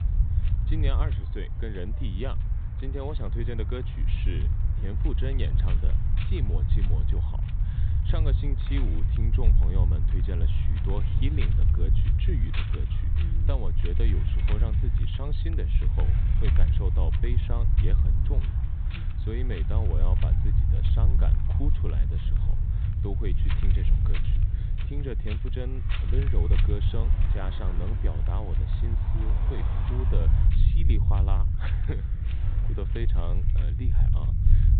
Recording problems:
high frequencies cut off; severe; nothing above 4 kHz
wind noise on the microphone; heavy; 7 dB below the speech
low rumble; loud; throughout; 3 dB below the speech
traffic noise; noticeable; throughout; 15 dB below the speech

